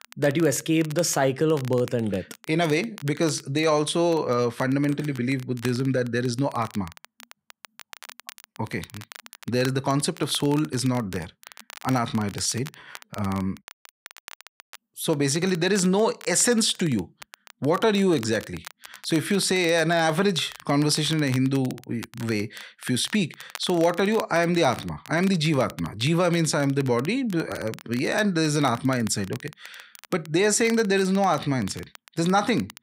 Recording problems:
crackle, like an old record; faint; 20 dB below the speech

